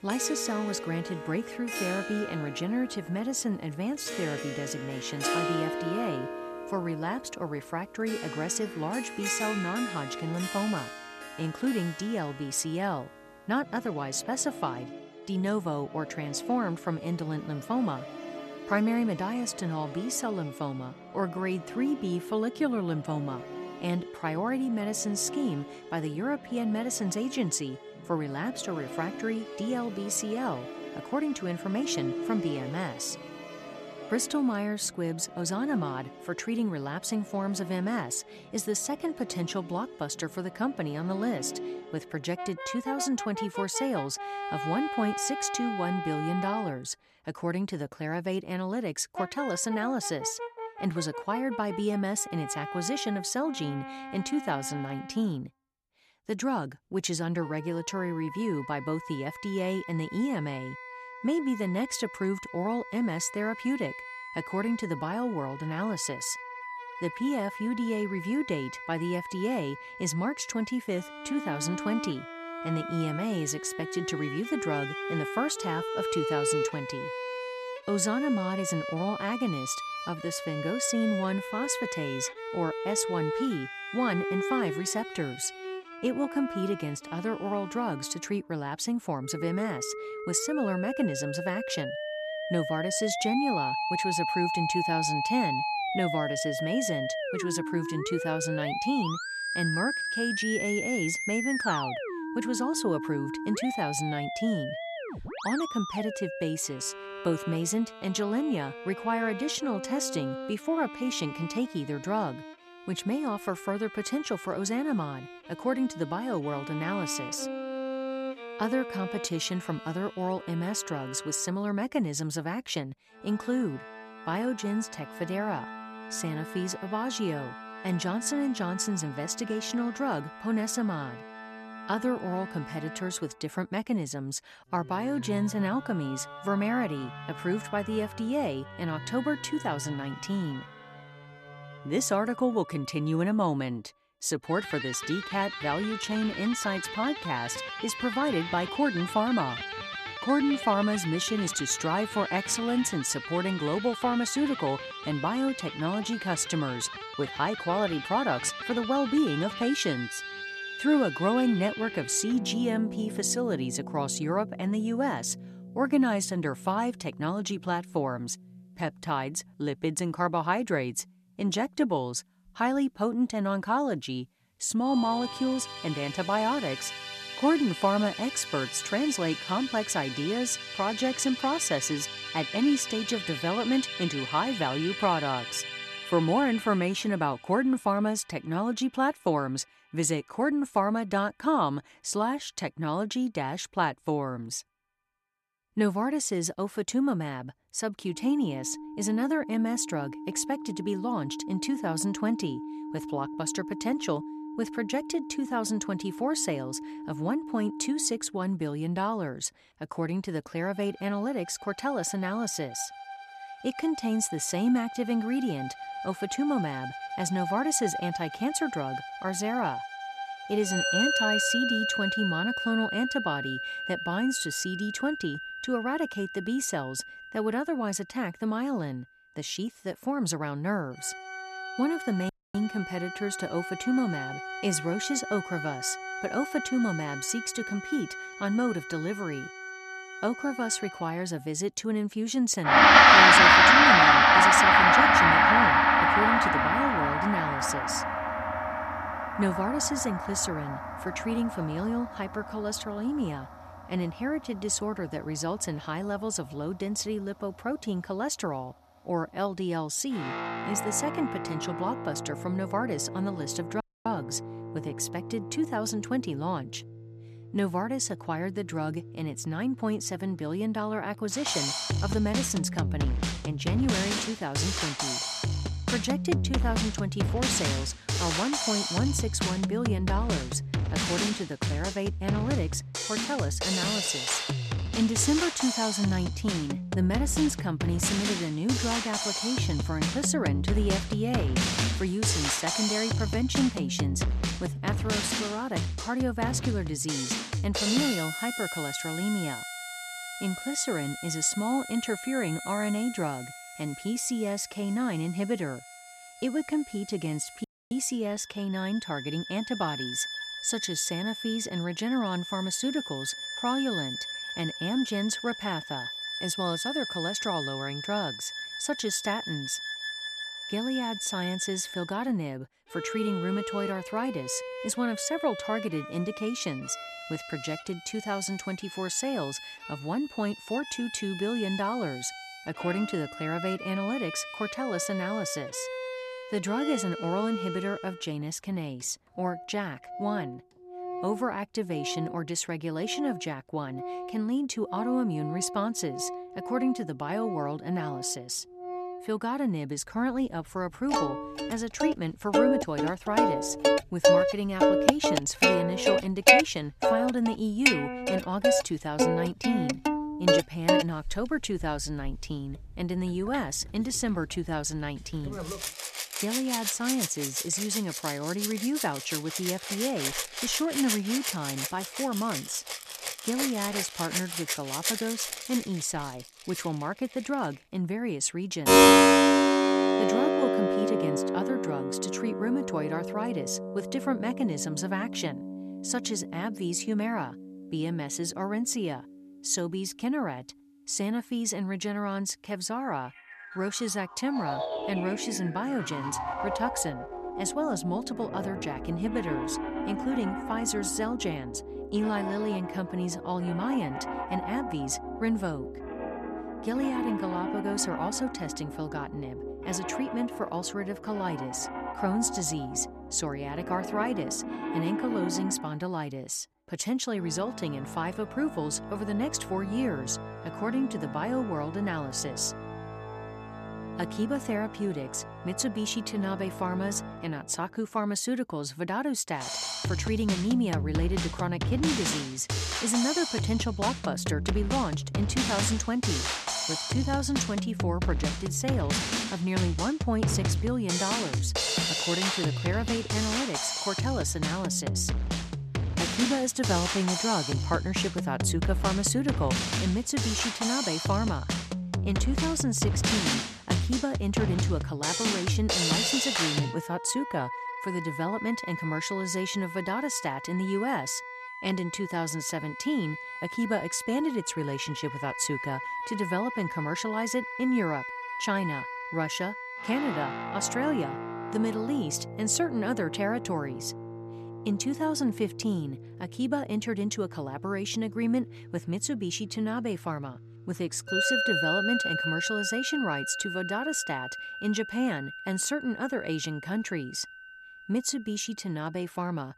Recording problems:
background music; very loud; throughout; 1 dB above the speech
audio cutting out; at 3:52, at 4:24 and at 5:08

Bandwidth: 14 kHz